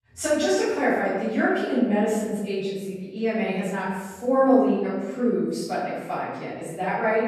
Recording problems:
room echo; strong; dies away in 1.1 s
off-mic speech; far

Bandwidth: 14.5 kHz